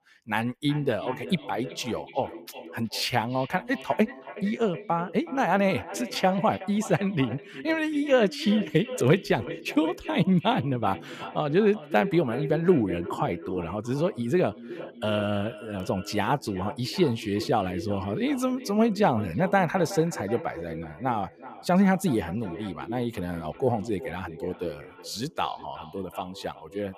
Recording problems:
echo of what is said; noticeable; throughout; 370 ms later, 15 dB below the speech

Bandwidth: 15 kHz